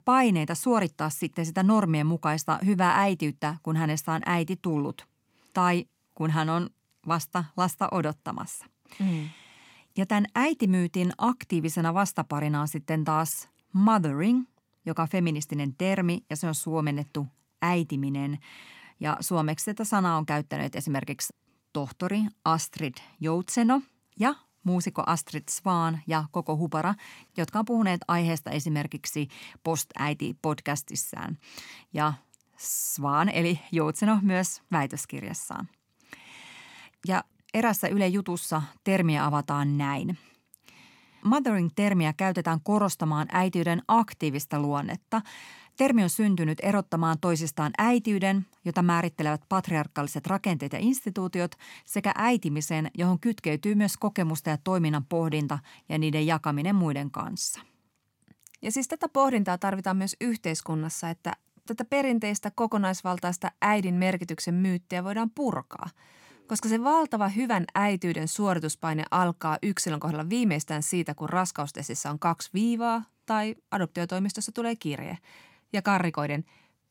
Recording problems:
none

